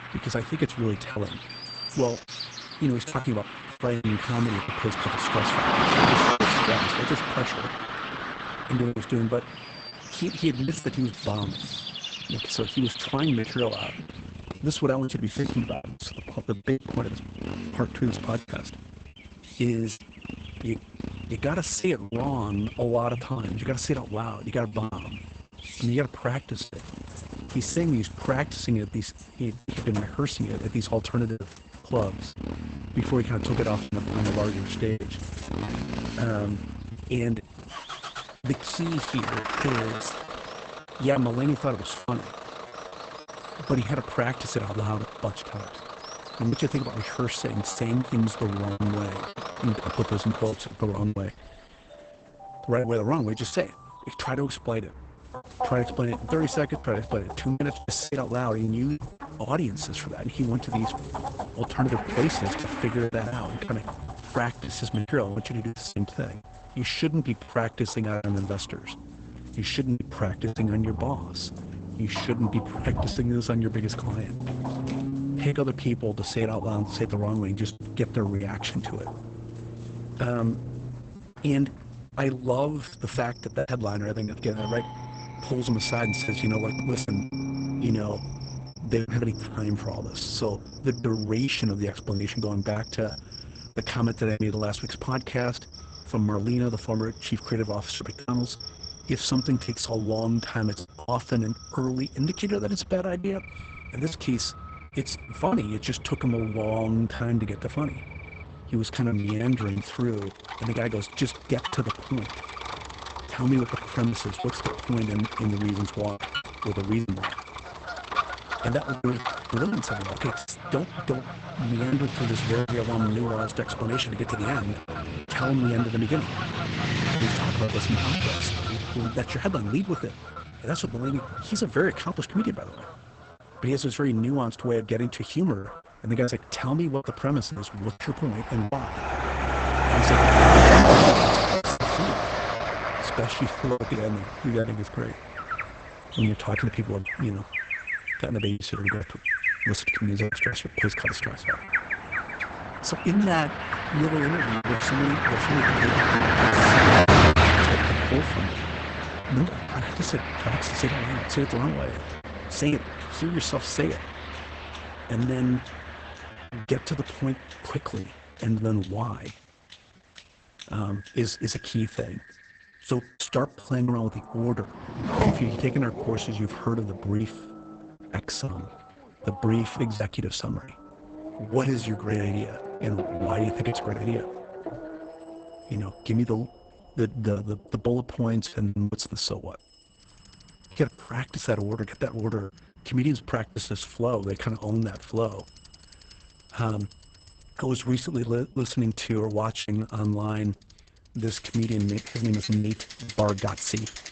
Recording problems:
garbled, watery; badly; nothing above 8 kHz
traffic noise; very loud; throughout; as loud as the speech
animal sounds; loud; throughout; 8 dB below the speech
alarms or sirens; faint; throughout; 20 dB below the speech
choppy; very; 6% of the speech affected

